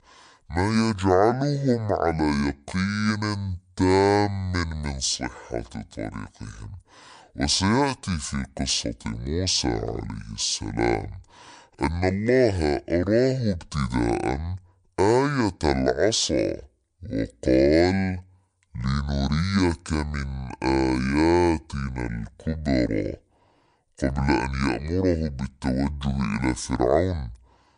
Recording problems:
wrong speed and pitch; too slow and too low; 0.6 times normal speed

